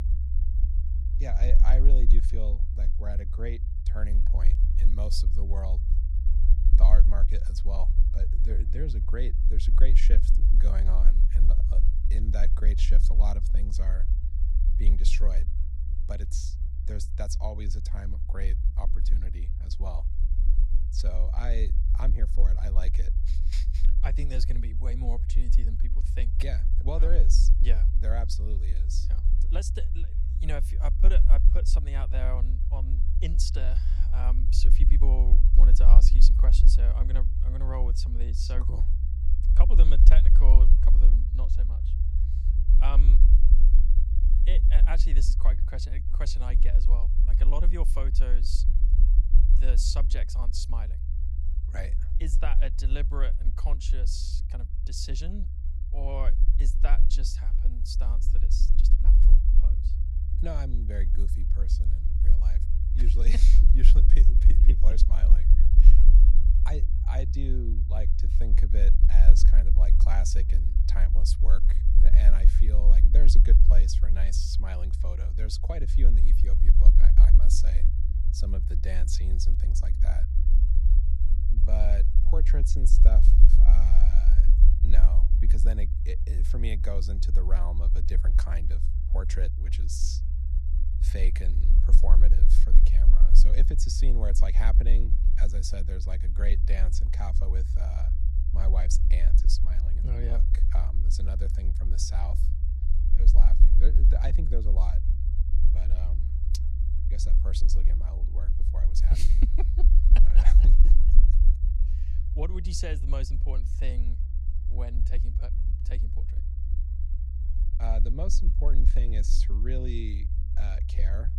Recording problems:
low rumble; loud; throughout; 6 dB below the speech

